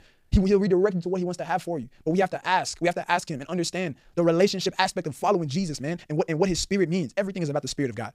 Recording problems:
wrong speed, natural pitch; too fast; 1.7 times normal speed

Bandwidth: 15 kHz